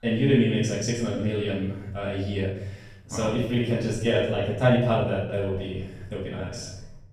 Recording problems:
off-mic speech; far
room echo; noticeable; dies away in 0.8 s
uneven, jittery; strongly; from 1 to 6.5 s

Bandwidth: 14.5 kHz